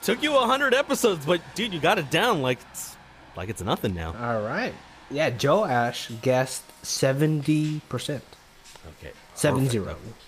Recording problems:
rain or running water; faint; throughout; 20 dB below the speech

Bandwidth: 15 kHz